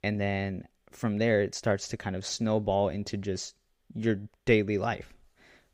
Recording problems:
none

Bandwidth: 15.5 kHz